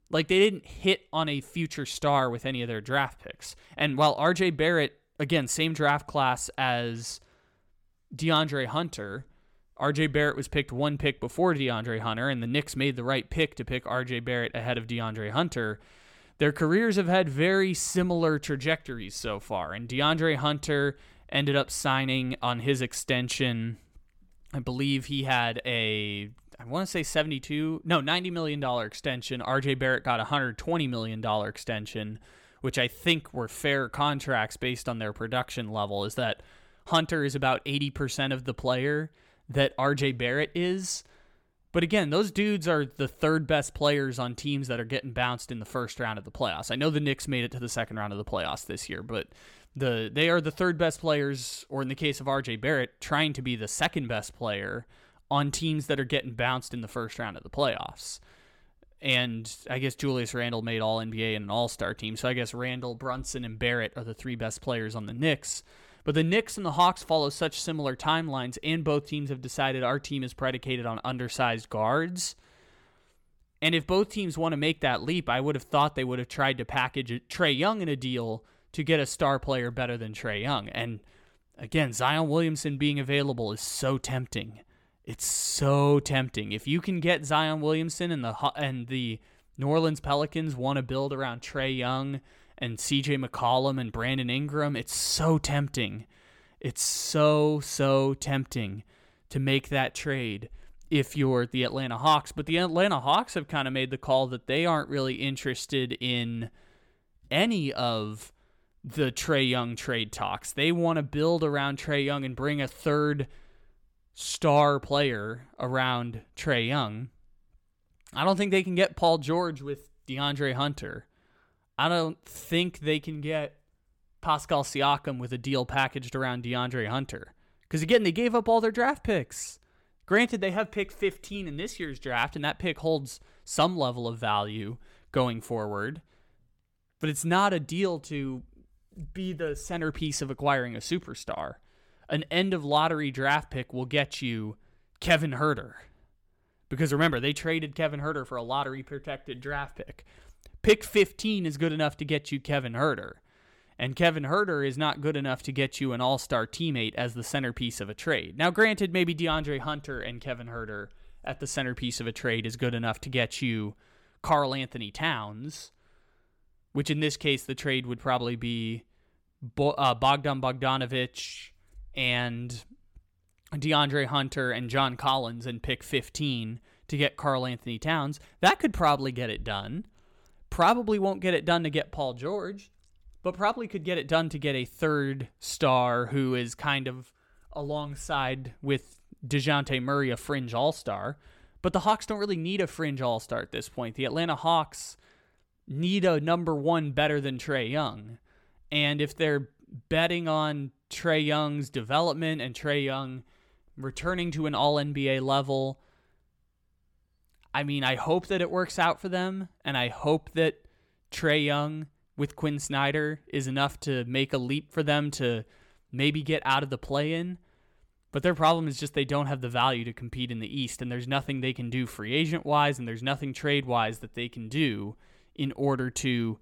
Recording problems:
none

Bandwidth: 17.5 kHz